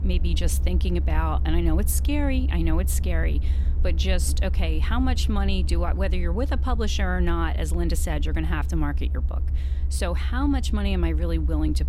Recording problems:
low rumble; noticeable; throughout; 15 dB below the speech

